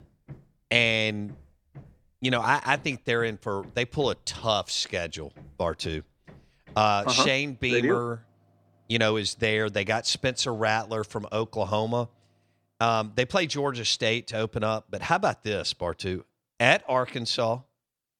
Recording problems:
machinery noise; faint; until 12 s; 30 dB below the speech

